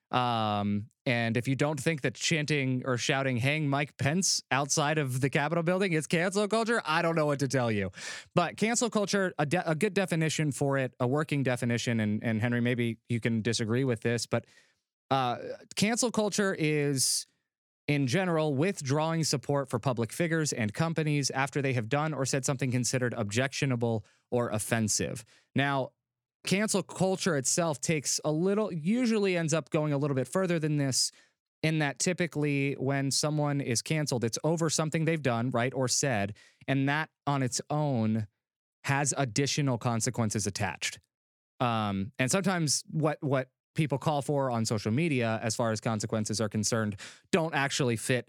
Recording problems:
squashed, flat; somewhat

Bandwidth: 18.5 kHz